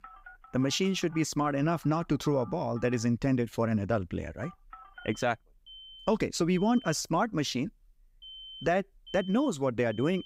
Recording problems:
alarms or sirens; noticeable; throughout; 20 dB below the speech

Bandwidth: 15.5 kHz